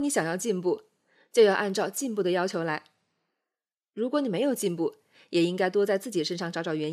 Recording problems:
abrupt cut into speech; at the start and the end

